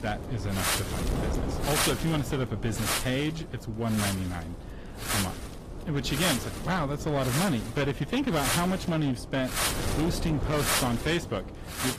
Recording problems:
distortion; slight; 12% of the sound clipped
garbled, watery; slightly; nothing above 14.5 kHz
wind noise on the microphone; heavy; 1 dB above the speech

